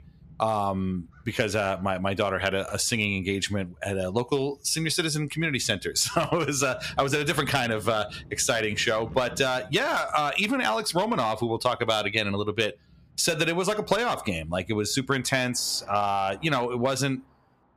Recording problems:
distortion; slight; 3% of the sound clipped
squashed, flat; somewhat, background pumping
traffic noise; faint; throughout; 25 dB below the speech

